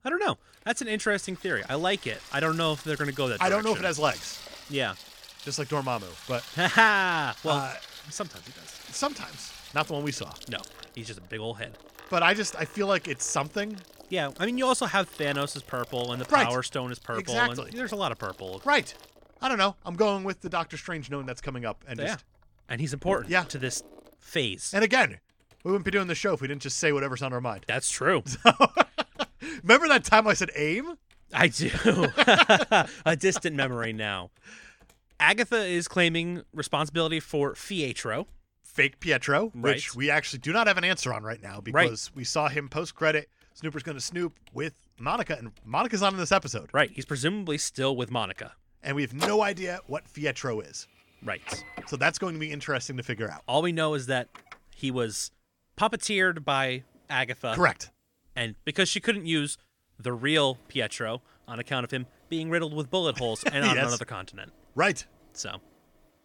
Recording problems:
household noises; noticeable; throughout; 15 dB below the speech

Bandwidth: 17 kHz